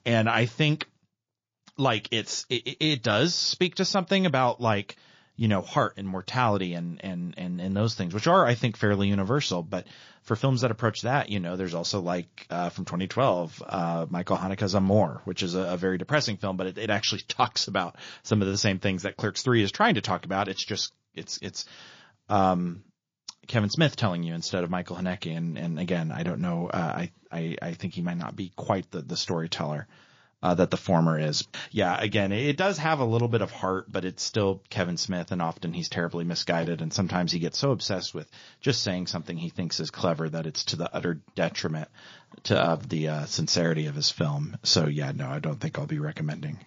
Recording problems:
garbled, watery; slightly; nothing above 6 kHz

